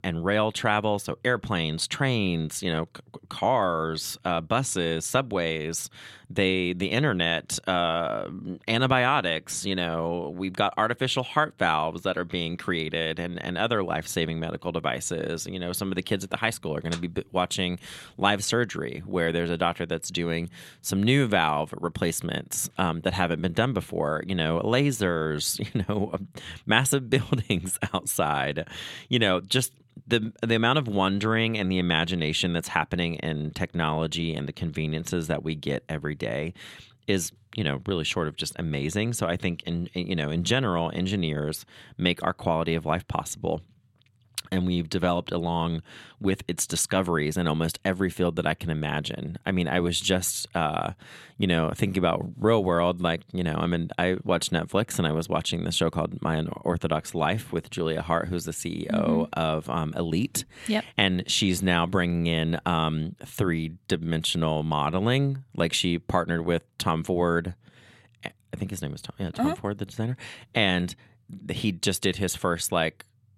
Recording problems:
none

